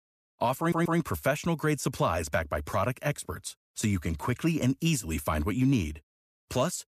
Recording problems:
audio stuttering; at 0.5 s

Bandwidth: 14.5 kHz